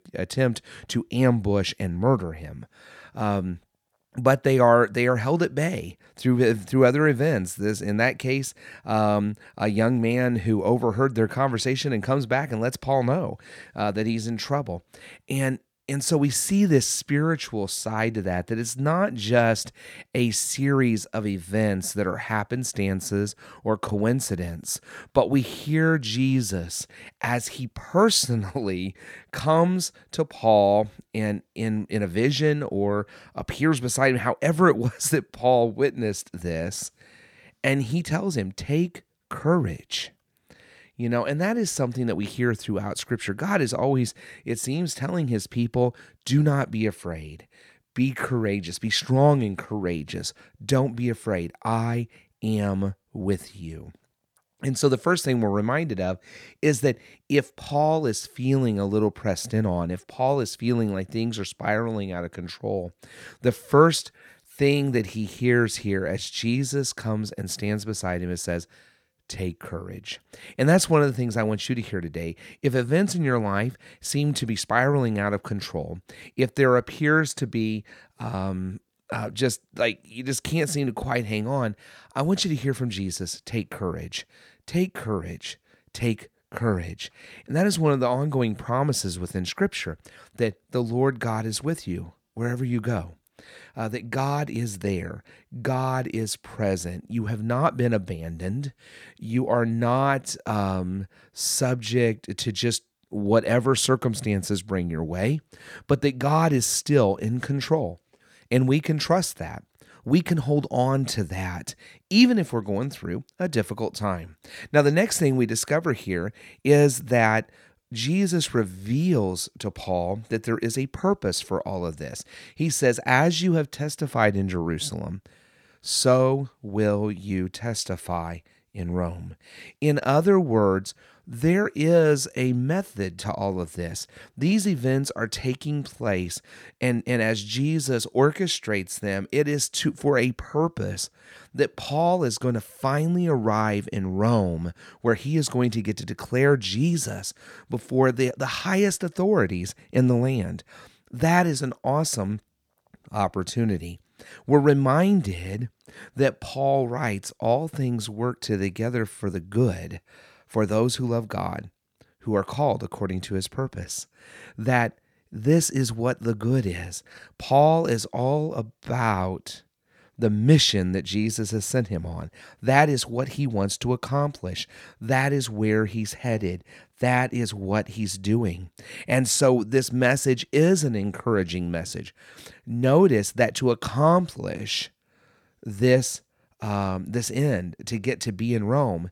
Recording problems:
none

